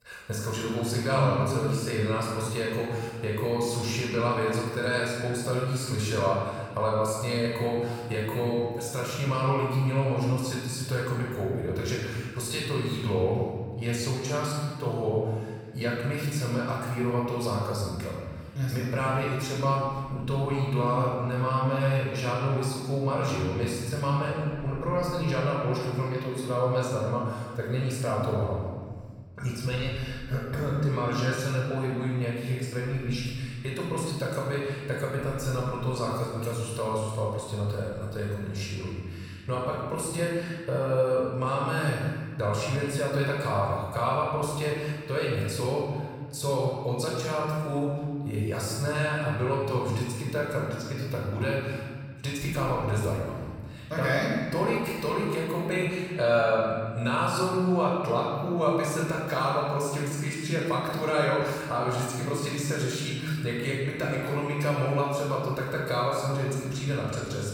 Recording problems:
room echo; strong; dies away in 1.6 s
off-mic speech; far

